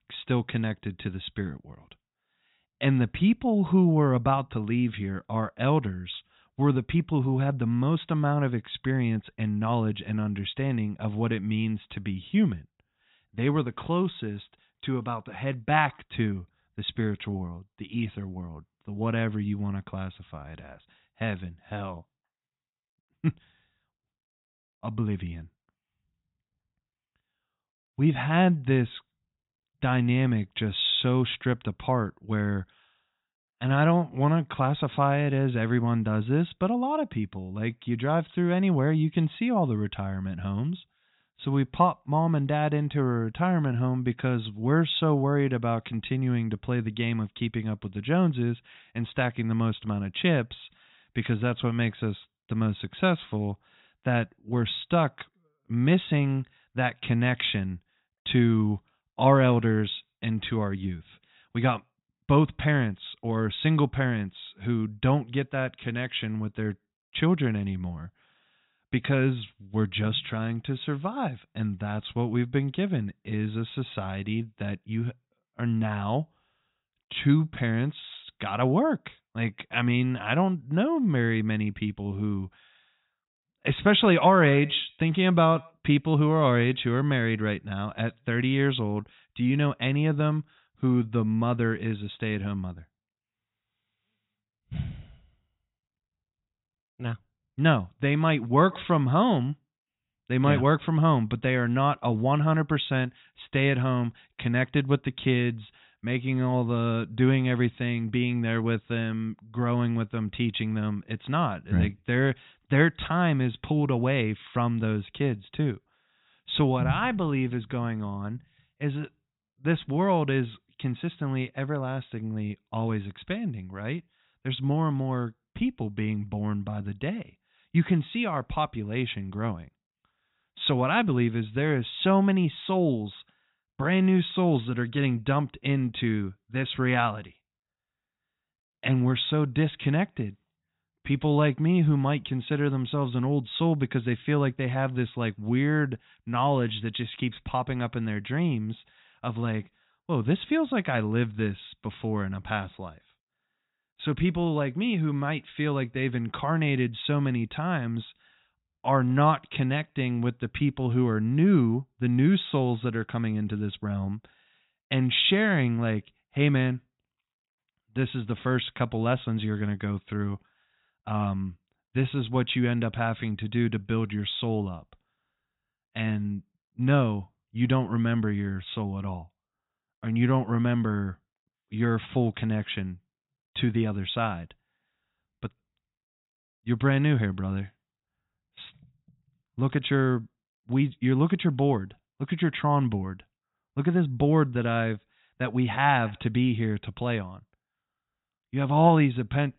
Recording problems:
high frequencies cut off; severe; nothing above 4 kHz

